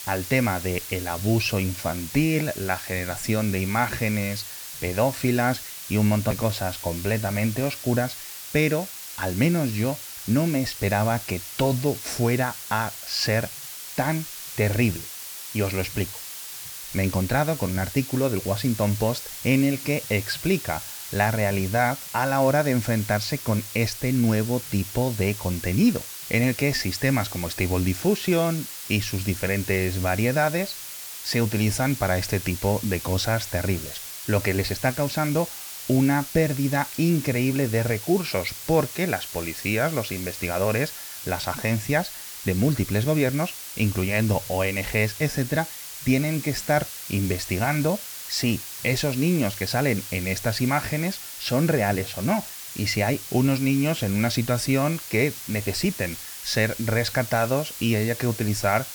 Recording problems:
hiss; loud; throughout; 9 dB below the speech

